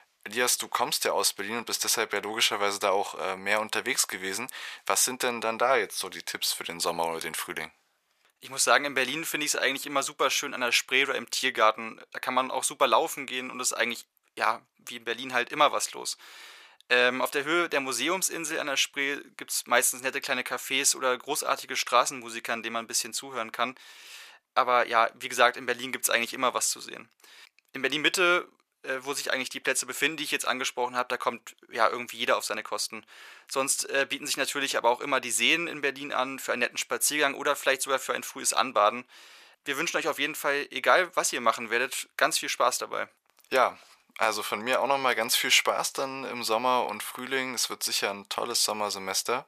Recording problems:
thin; very; fading below 850 Hz

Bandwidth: 14.5 kHz